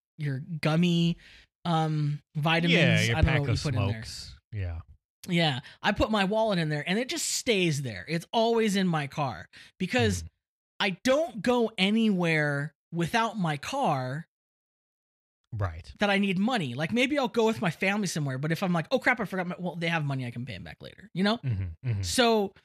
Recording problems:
none

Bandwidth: 14.5 kHz